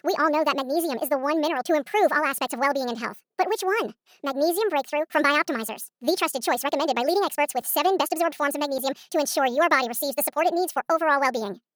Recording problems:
wrong speed and pitch; too fast and too high; 1.5 times normal speed

